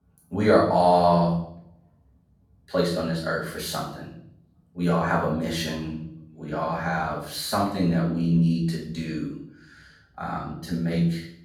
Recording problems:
off-mic speech; far
room echo; noticeable; dies away in 0.6 s

